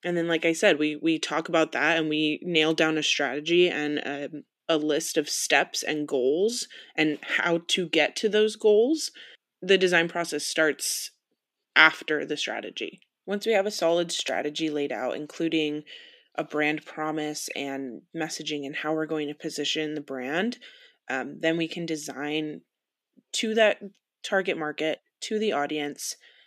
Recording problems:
thin; somewhat; fading below 350 Hz

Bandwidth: 15 kHz